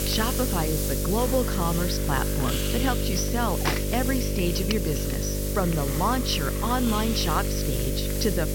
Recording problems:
high frequencies cut off; noticeable; nothing above 6 kHz
electrical hum; loud; throughout; 50 Hz, 6 dB below the speech
traffic noise; loud; throughout; 10 dB below the speech
hiss; loud; throughout; 4 dB below the speech

